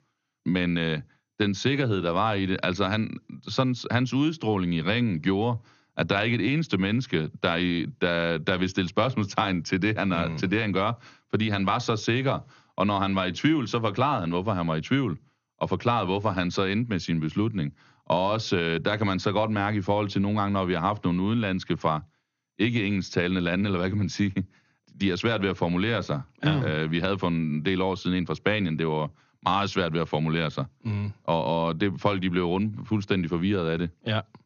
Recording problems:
garbled, watery; slightly; nothing above 6.5 kHz

